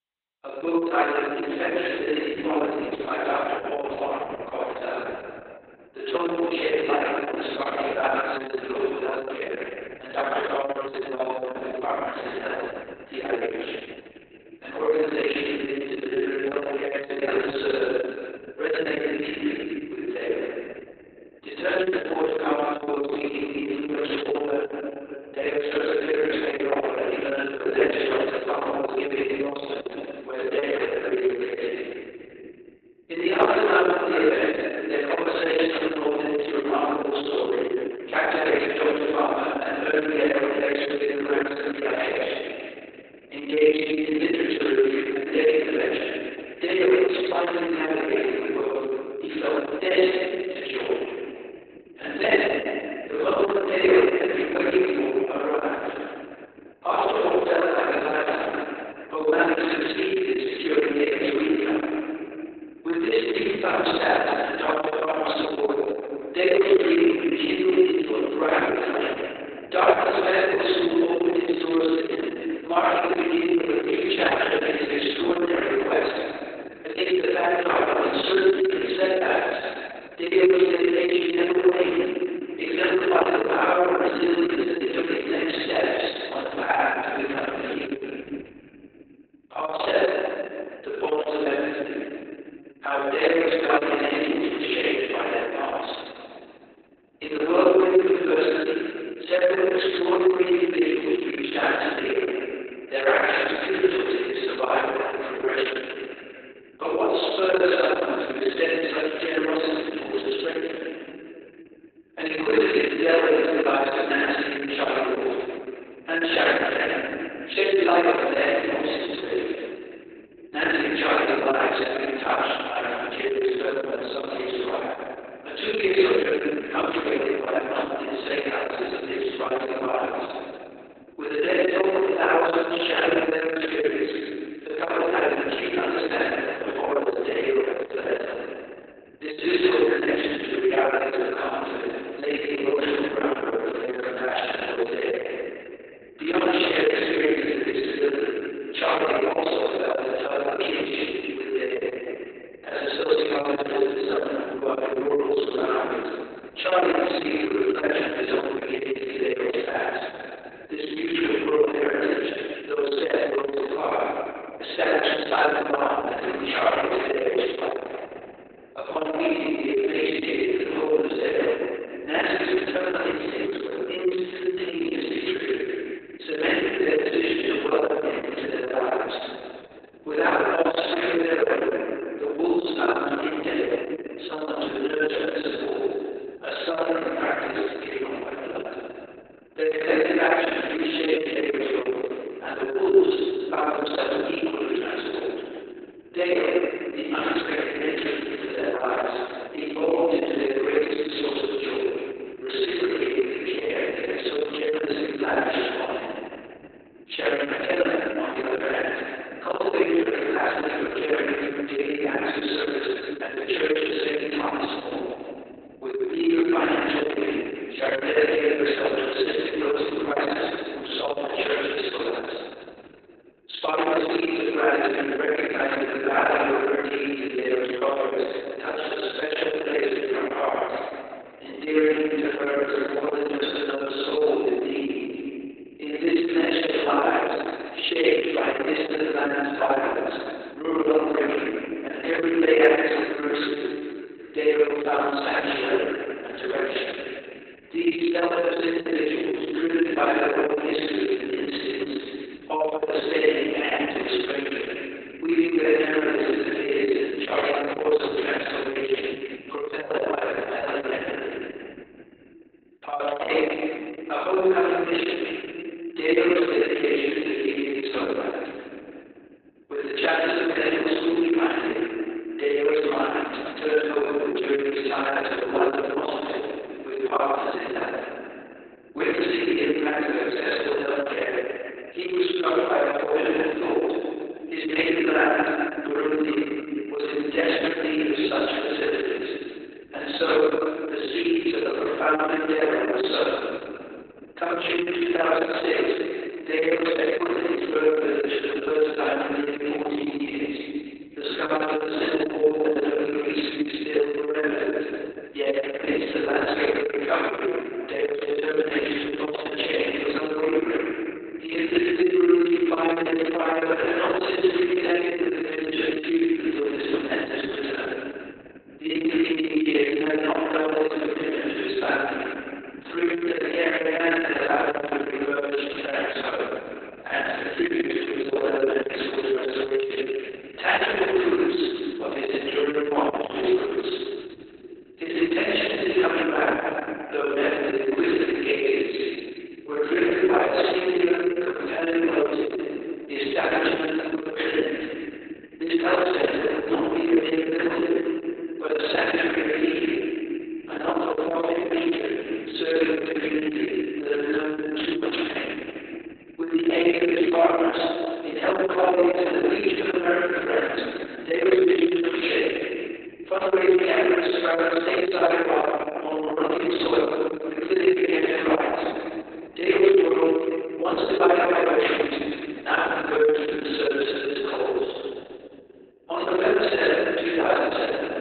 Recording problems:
room echo; strong; dies away in 2.9 s
off-mic speech; far
garbled, watery; badly; nothing above 4 kHz
thin; somewhat; fading below 350 Hz

